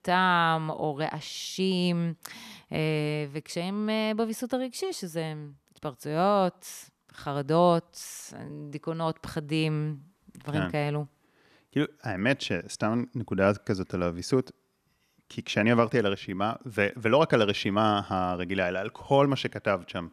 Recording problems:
none

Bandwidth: 14 kHz